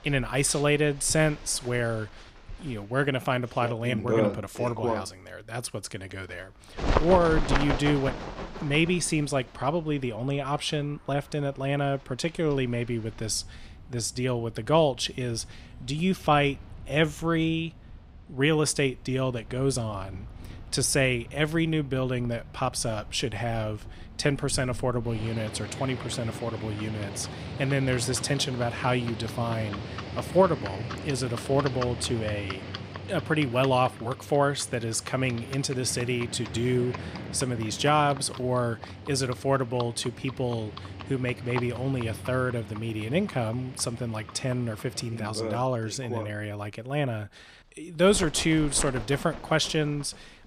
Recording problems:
animal sounds; loud; throughout; 10 dB below the speech

